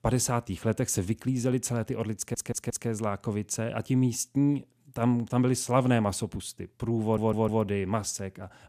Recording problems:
audio stuttering; at 2 s and at 7 s

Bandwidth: 14.5 kHz